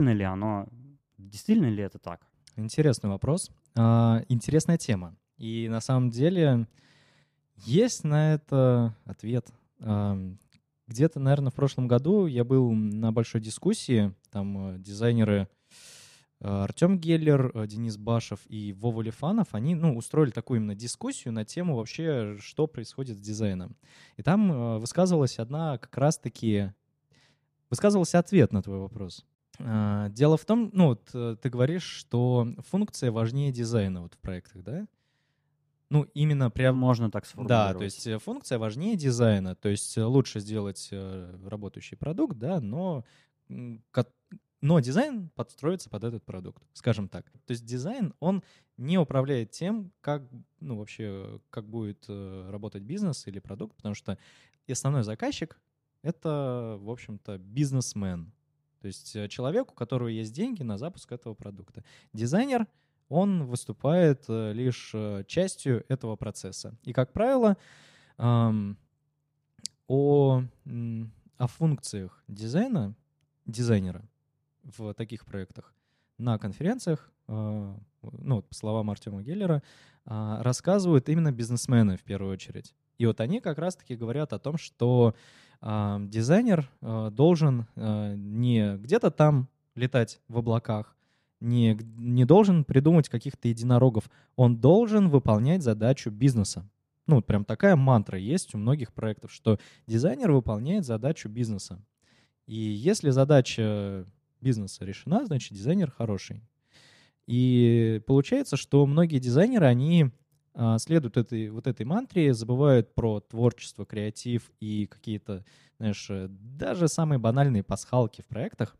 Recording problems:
abrupt cut into speech; at the start

